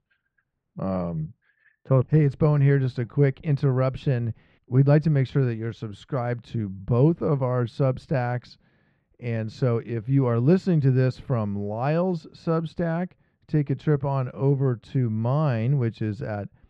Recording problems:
muffled; very; fading above 2 kHz

